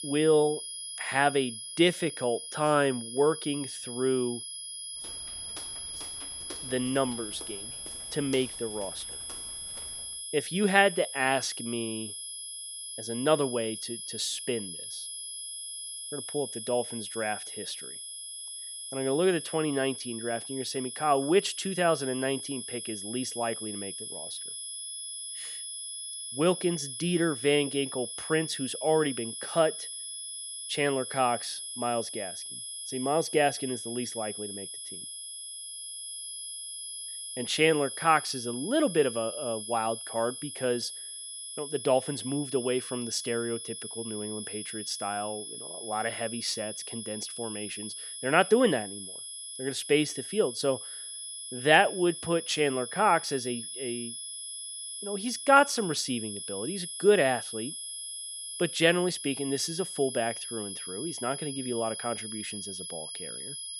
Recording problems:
high-pitched whine; loud; throughout; 10.5 kHz, 8 dB below the speech
footsteps; faint; from 5 to 10 s; peak 15 dB below the speech

